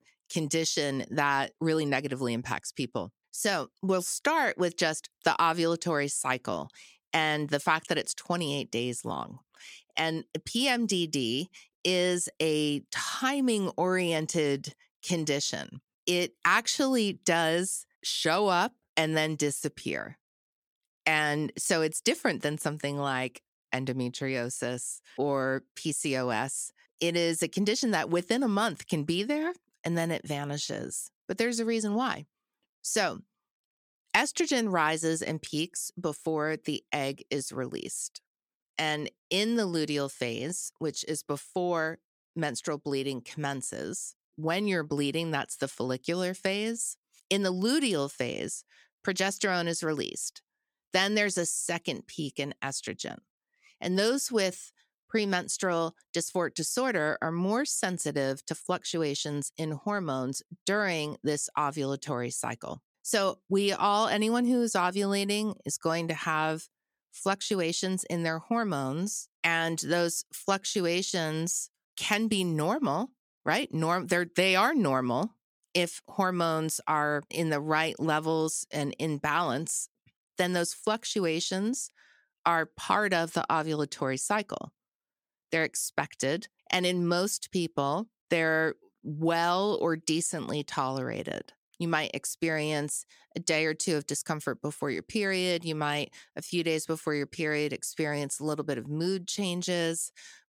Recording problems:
none

